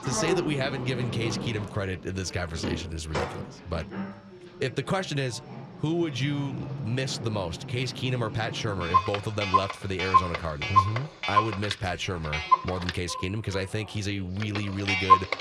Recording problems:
household noises; very loud; throughout; 2 dB above the speech
voice in the background; faint; throughout; 20 dB below the speech

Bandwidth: 14 kHz